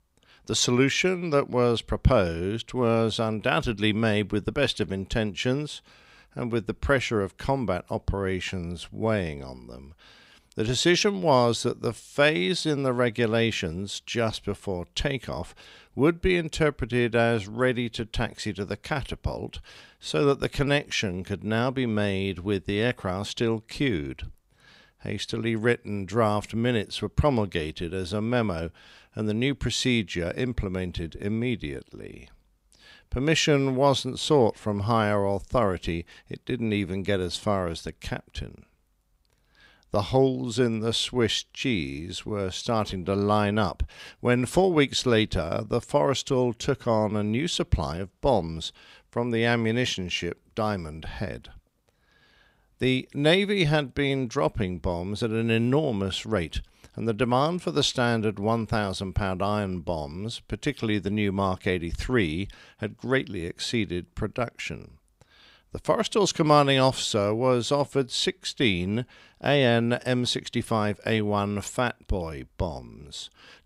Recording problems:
none

